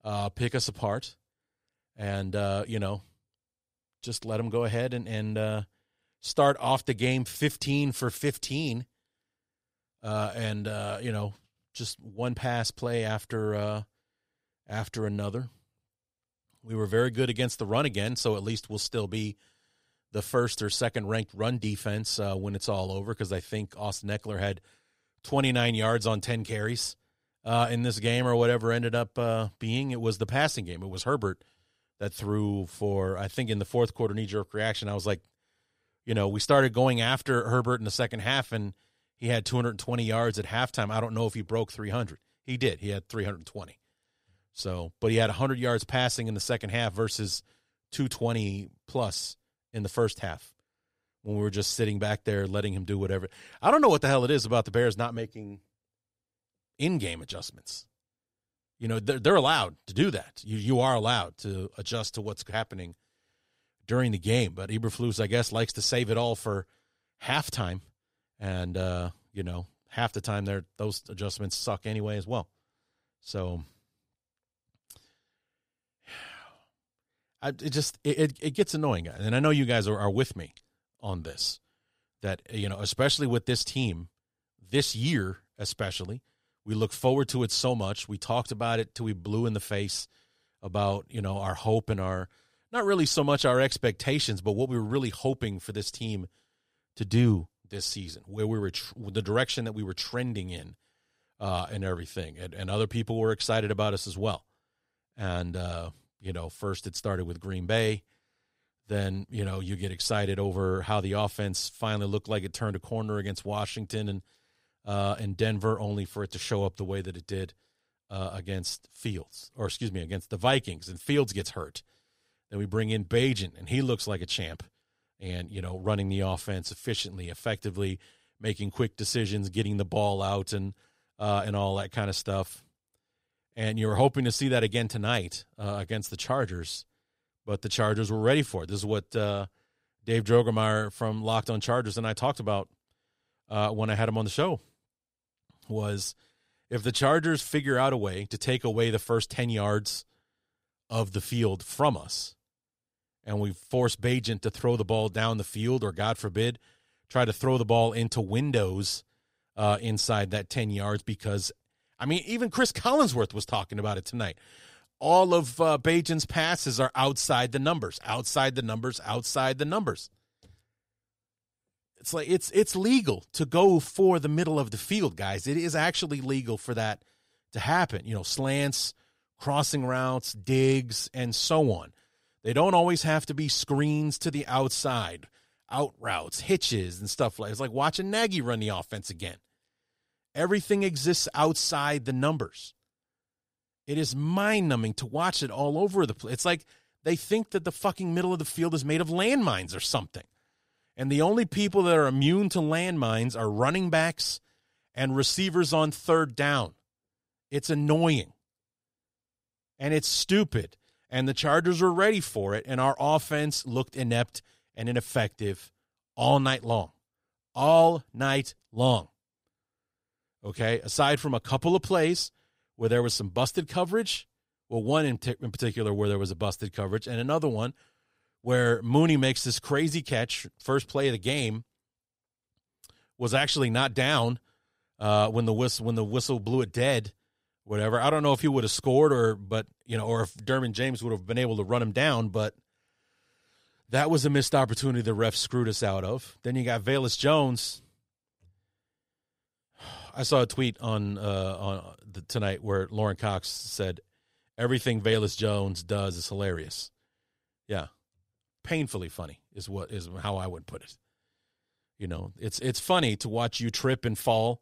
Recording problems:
none

